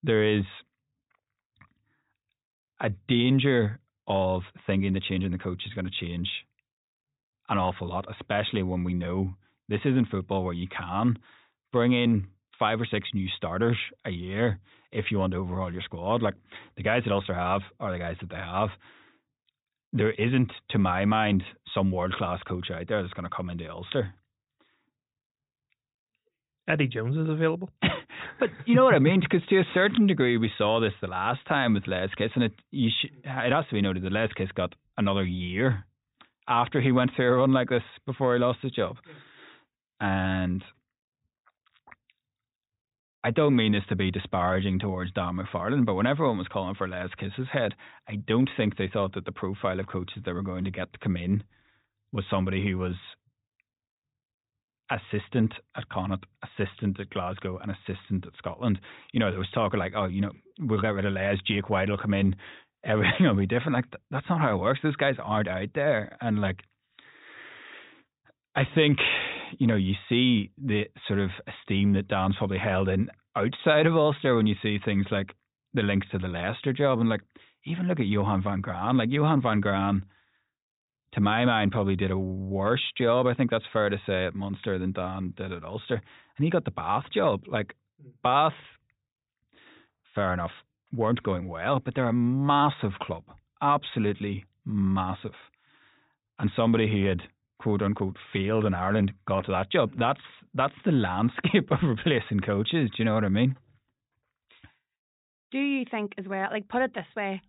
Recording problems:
high frequencies cut off; severe; nothing above 4 kHz

